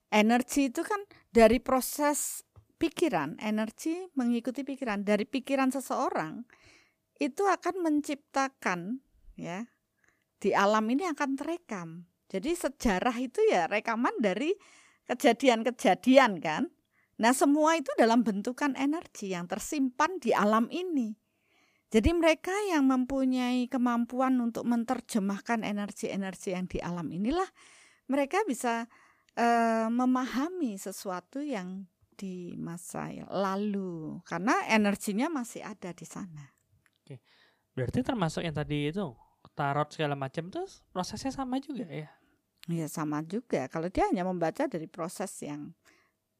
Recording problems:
none

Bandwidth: 15 kHz